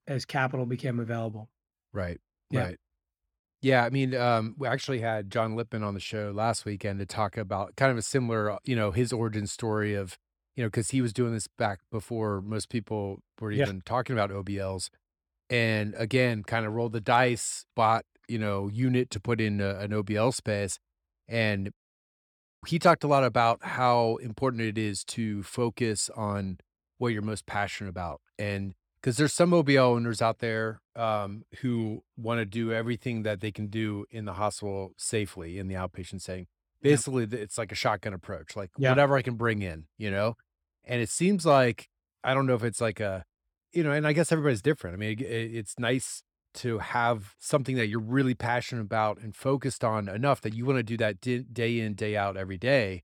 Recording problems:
none

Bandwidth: 18.5 kHz